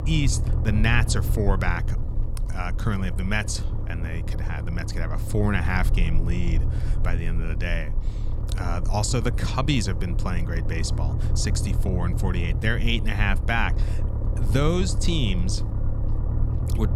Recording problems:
low rumble; noticeable; throughout; 10 dB below the speech

